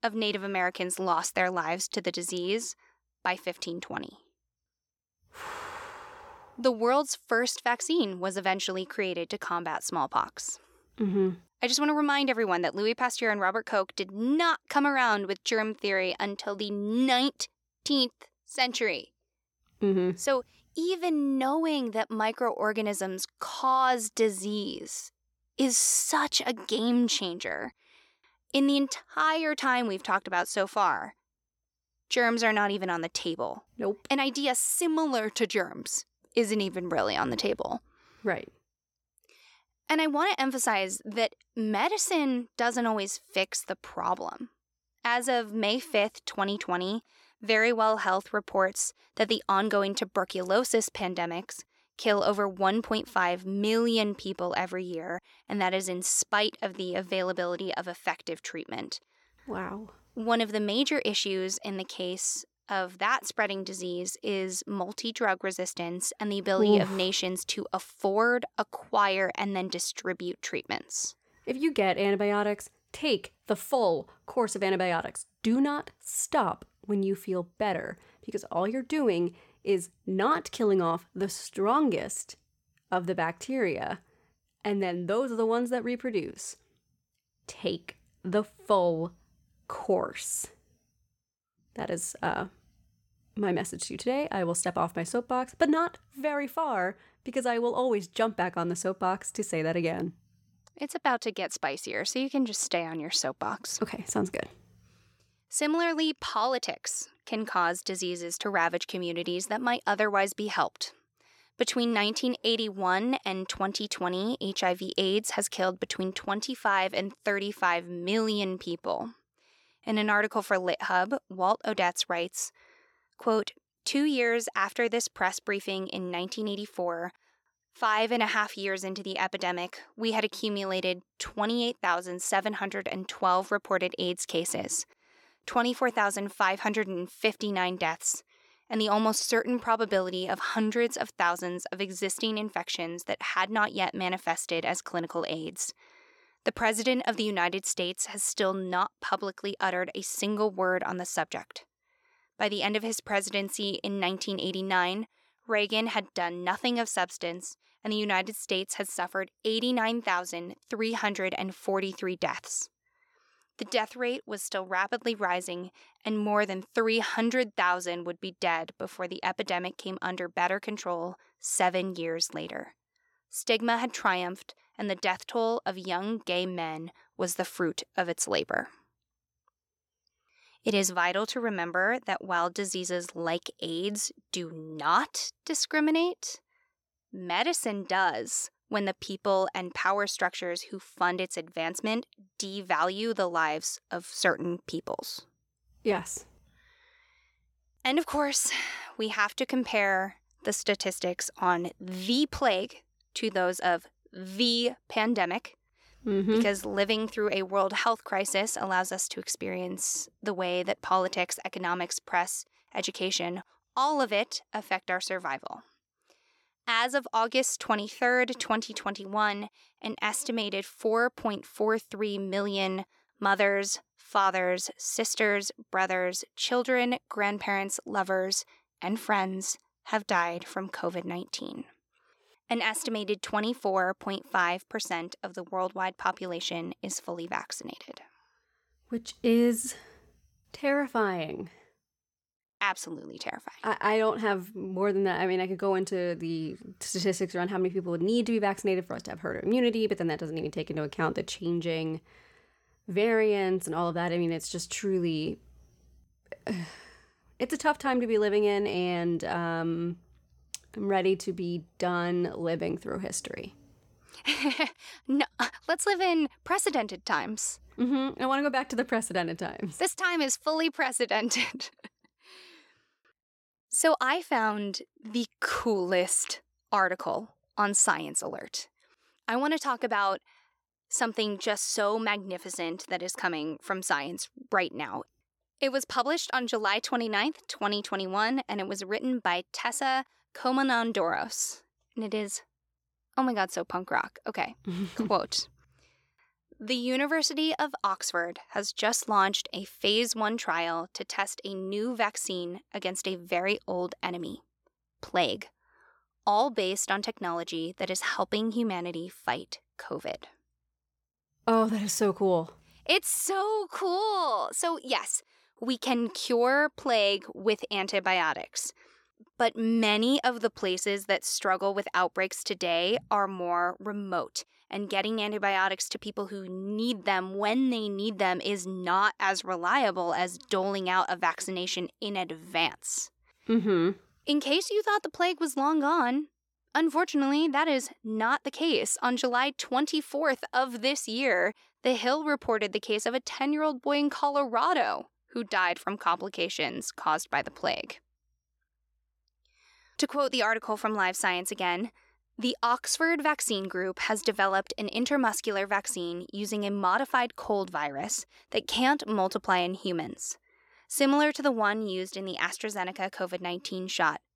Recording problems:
none

